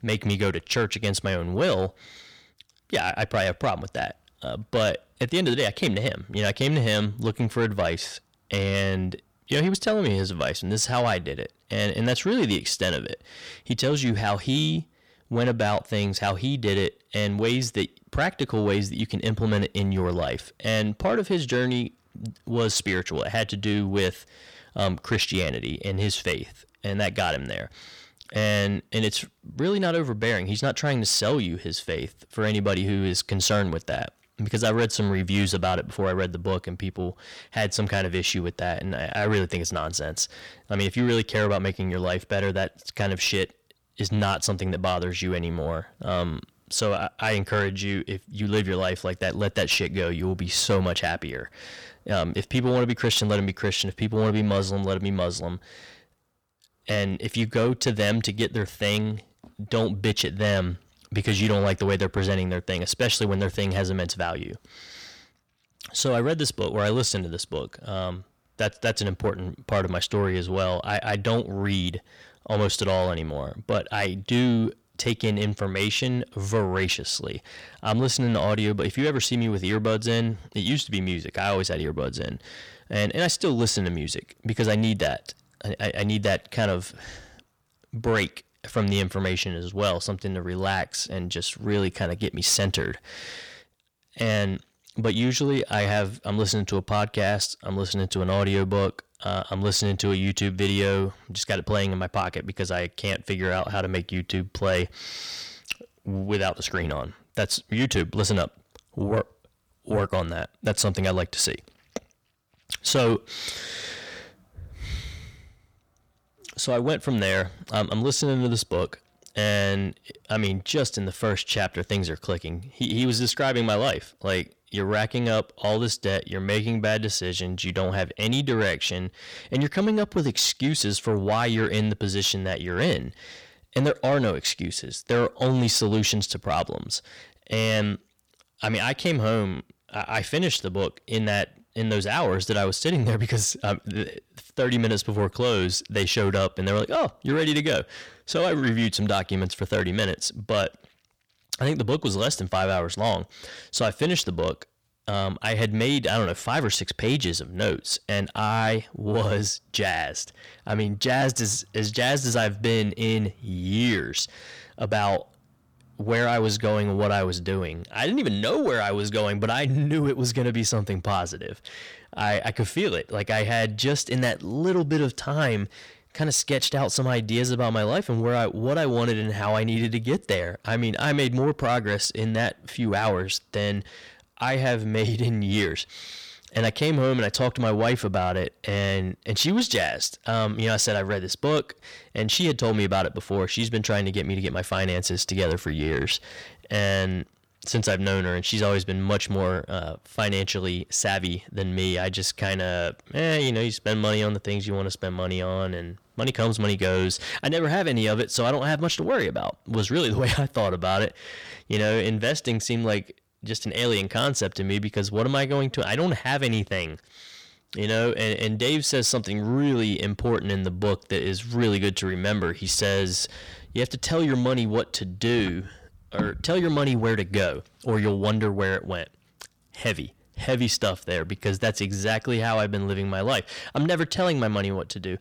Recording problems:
distortion; slight; 10 dB below the speech

